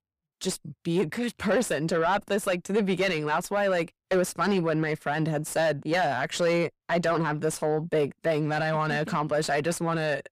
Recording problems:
distortion; slight; 10 dB below the speech

